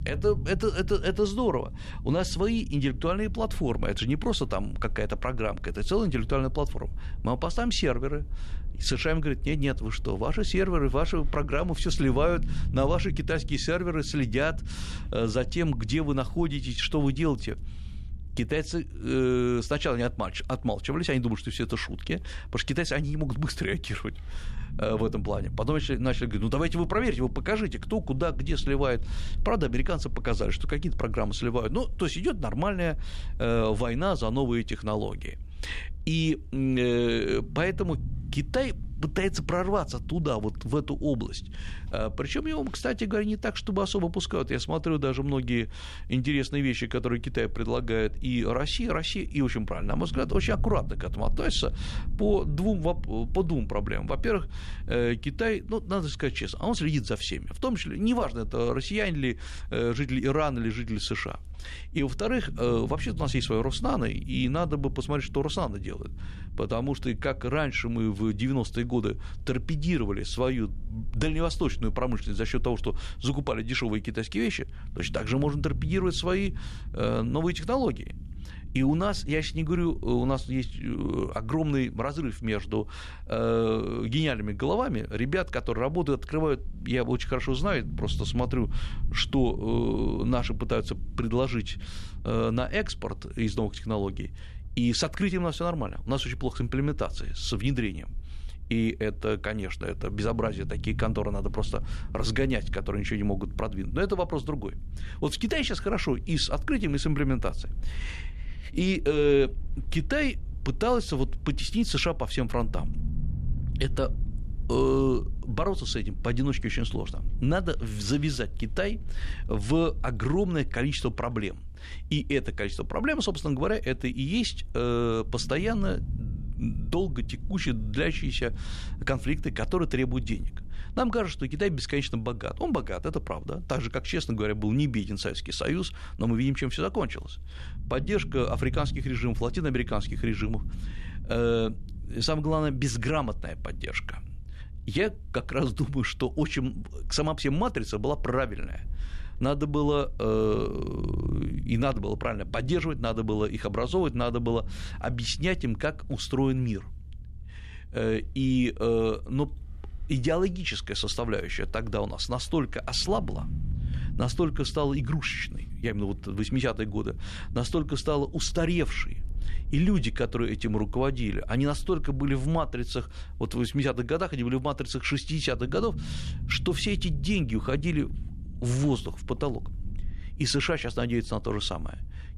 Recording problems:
low rumble; faint; throughout; 25 dB below the speech

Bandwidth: 13.5 kHz